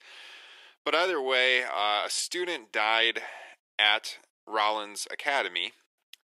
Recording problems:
thin; somewhat; fading below 350 Hz

